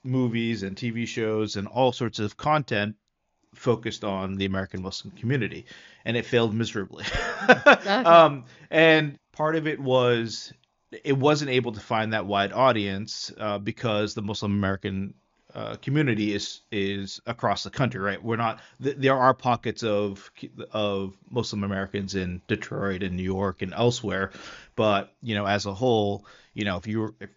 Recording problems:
high frequencies cut off; noticeable; nothing above 7 kHz

